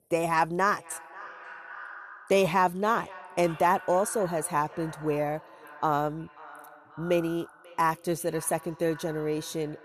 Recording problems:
echo of what is said; noticeable; throughout; 540 ms later, 15 dB below the speech

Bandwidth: 13.5 kHz